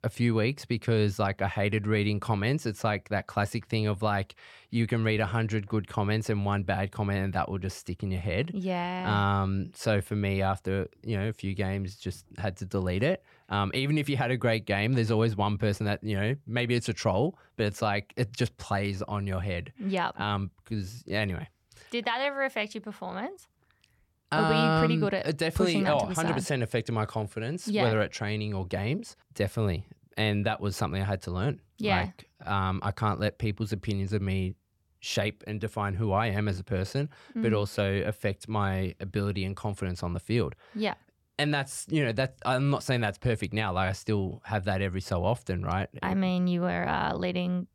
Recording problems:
none

